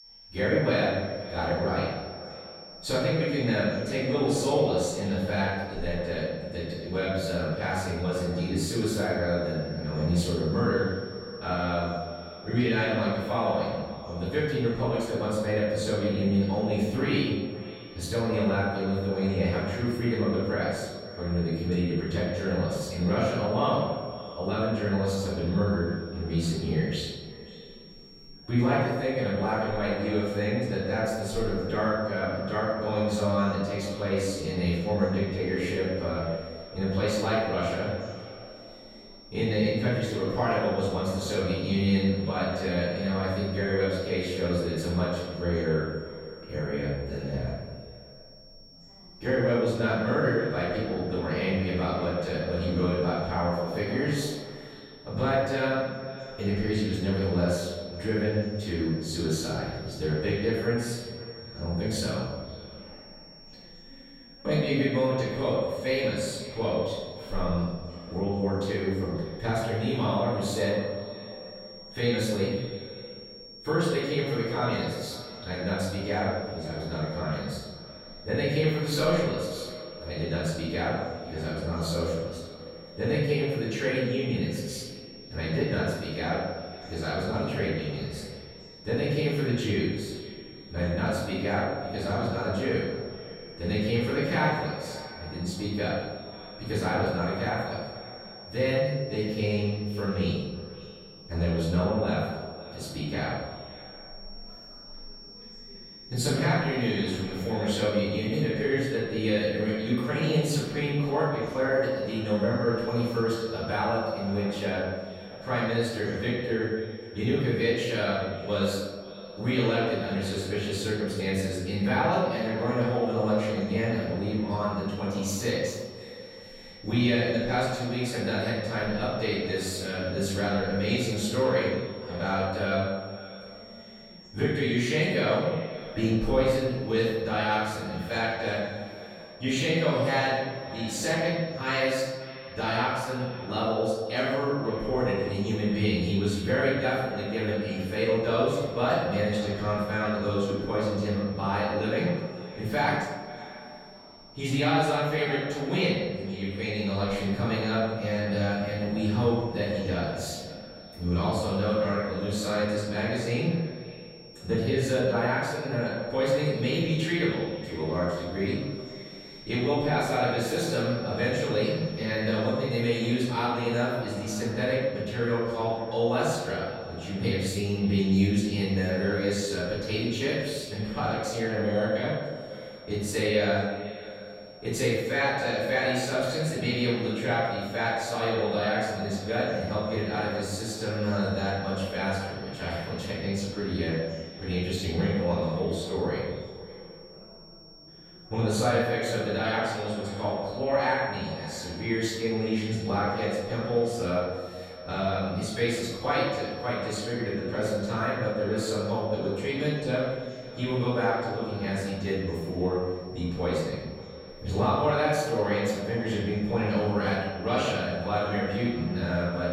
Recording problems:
room echo; strong; dies away in 1.1 s
off-mic speech; far
echo of what is said; noticeable; throughout; 540 ms later, 15 dB below the speech
high-pitched whine; noticeable; throughout; 5.5 kHz, 20 dB below the speech
voice in the background; faint; throughout; 25 dB below the speech

